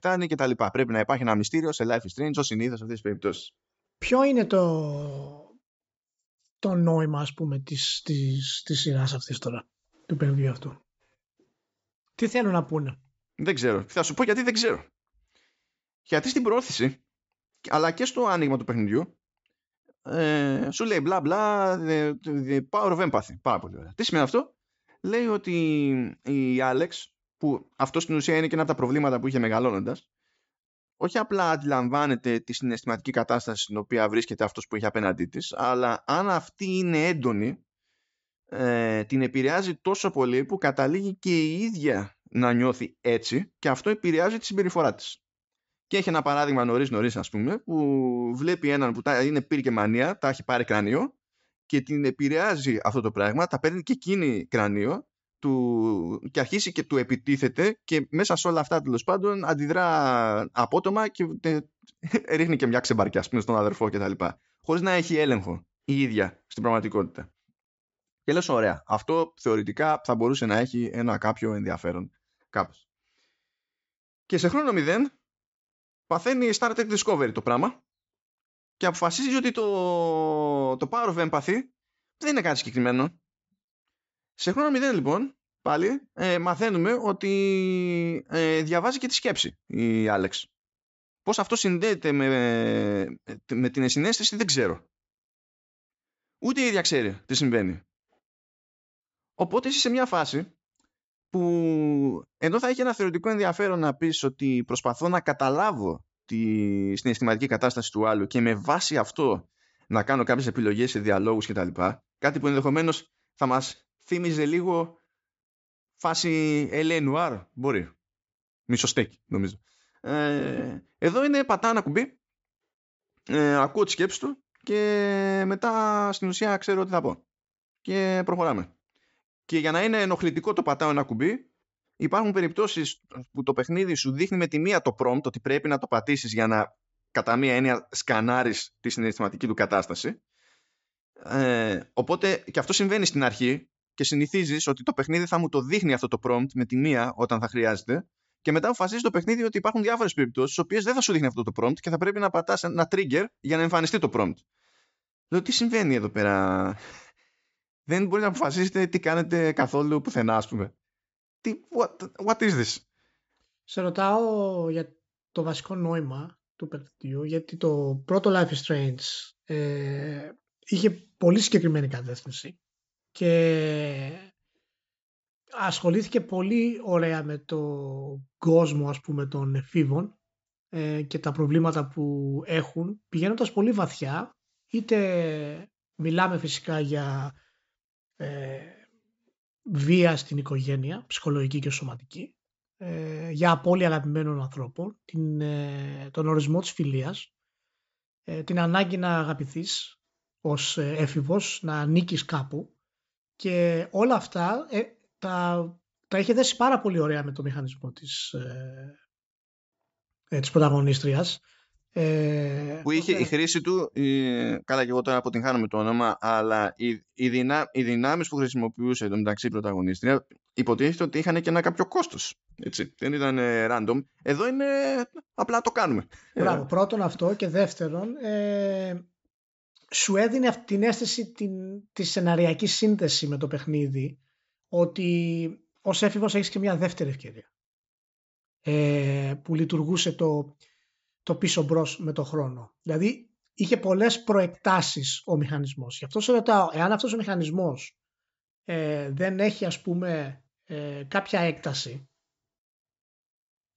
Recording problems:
high frequencies cut off; noticeable; nothing above 8 kHz

